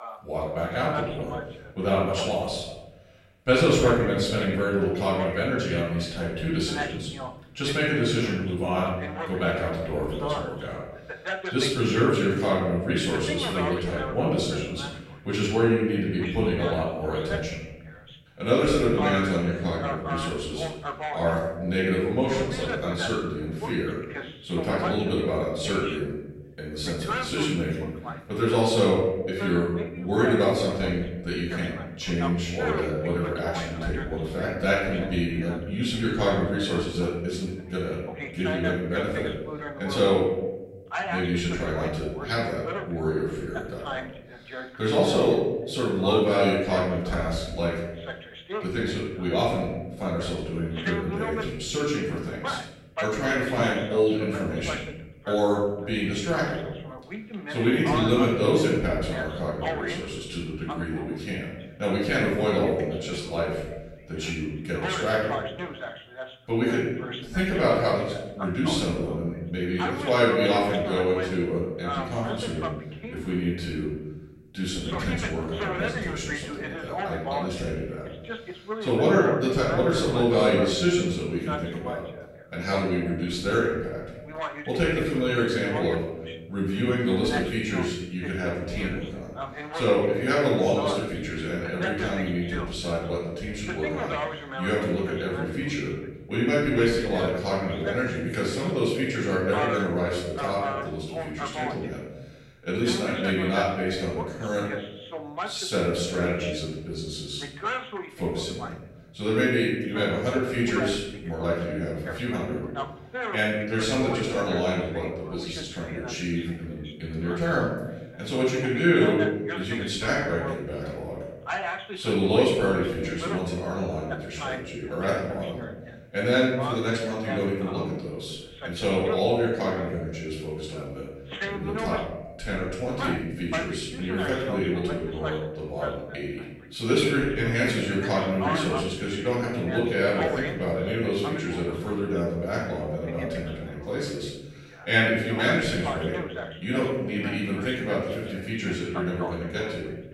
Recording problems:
off-mic speech; far
room echo; noticeable; dies away in 1 s
voice in the background; loud; throughout; 9 dB below the speech

